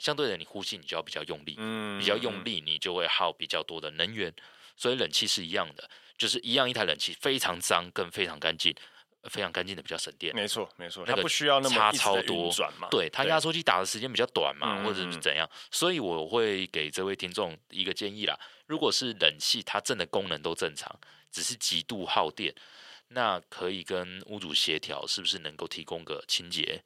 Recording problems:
thin; very; fading below 450 Hz

